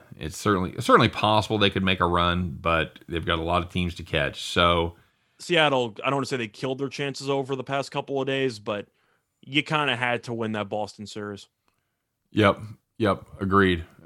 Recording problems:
none

